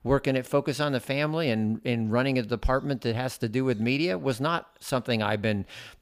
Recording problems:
none

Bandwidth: 15 kHz